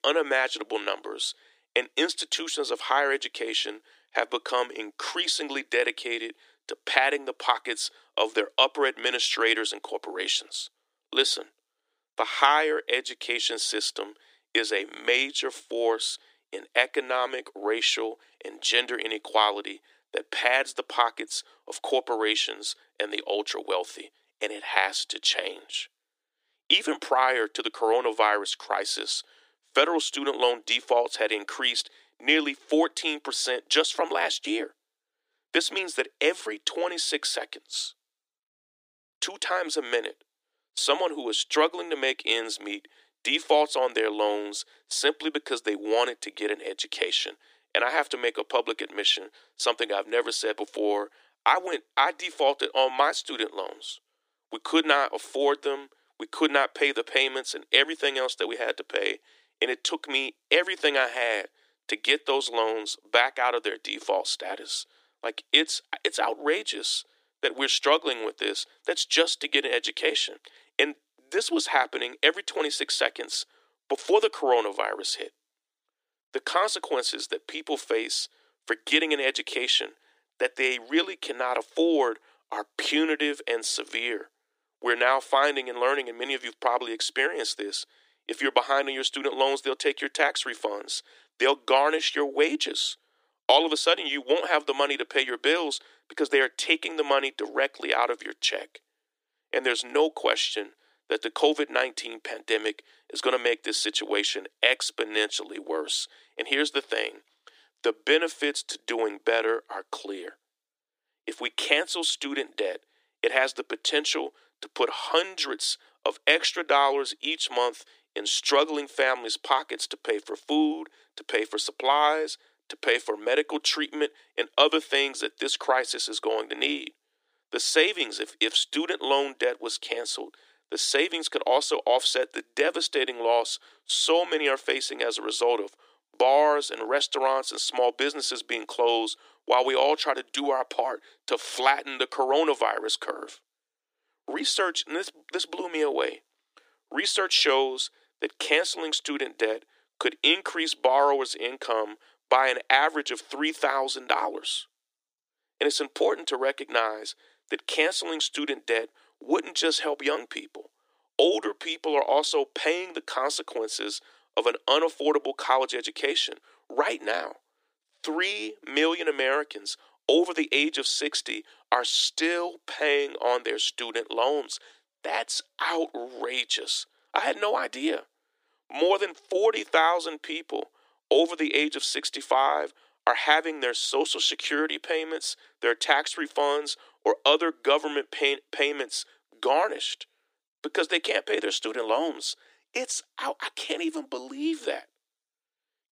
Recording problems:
thin; very; fading below 300 Hz

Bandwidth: 15 kHz